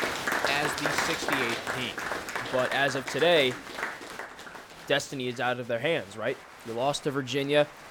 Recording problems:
crowd noise; loud; throughout; 3 dB below the speech

